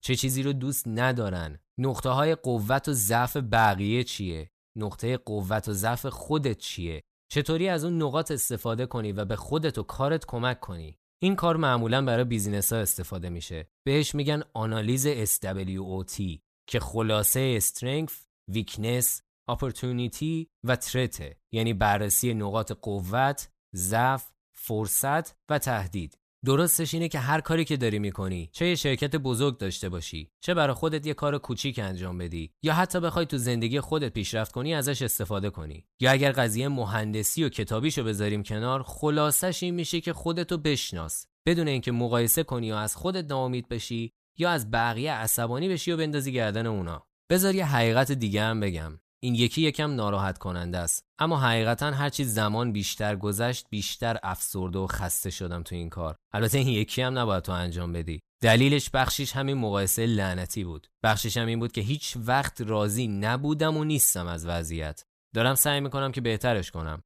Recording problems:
none

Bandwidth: 14.5 kHz